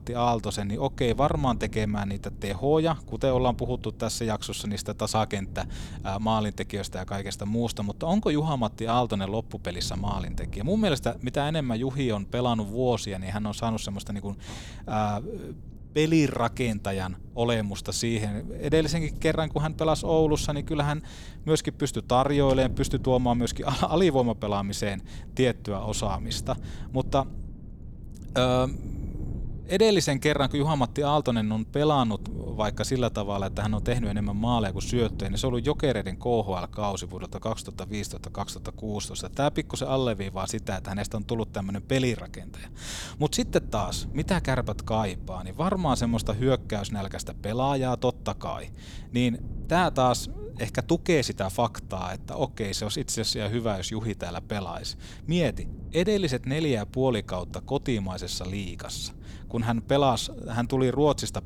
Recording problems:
wind noise on the microphone; occasional gusts; 25 dB below the speech

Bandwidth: 18.5 kHz